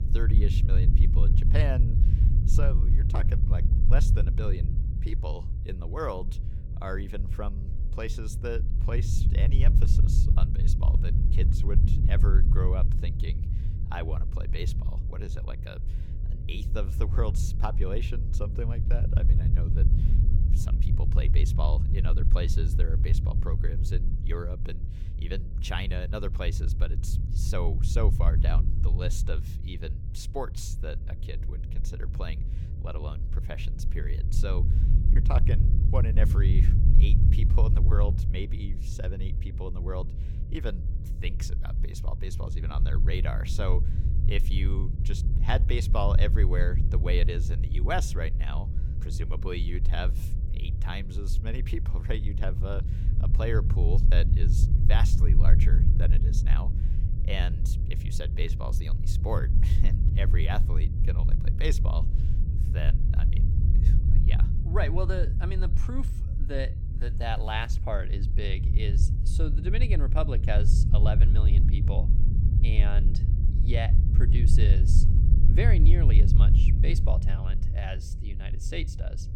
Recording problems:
low rumble; loud; throughout; 5 dB below the speech
electrical hum; faint; throughout; 50 Hz, 25 dB below the speech

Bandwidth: 17 kHz